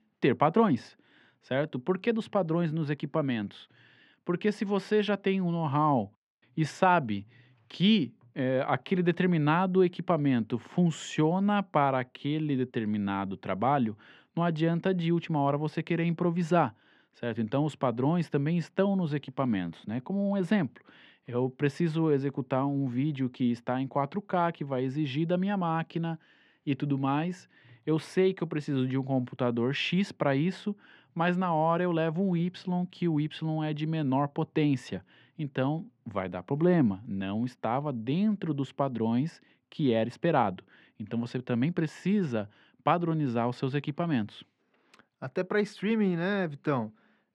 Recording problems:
muffled; very; fading above 2.5 kHz

